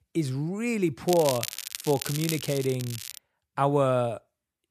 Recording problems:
crackling; loud; from 1 to 3 s; 7 dB below the speech

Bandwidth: 14.5 kHz